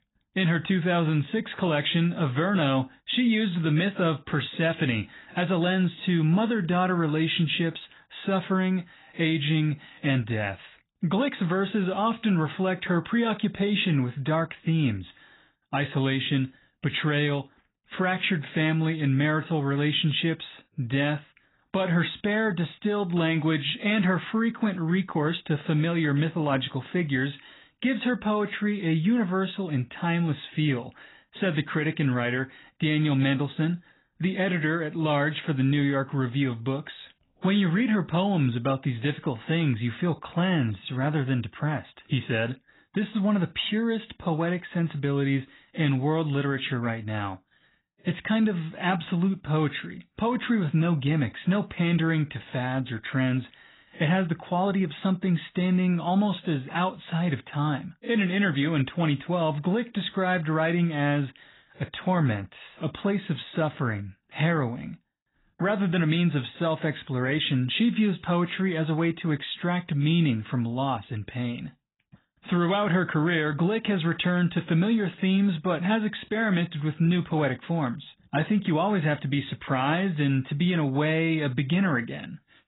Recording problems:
garbled, watery; badly; nothing above 4 kHz

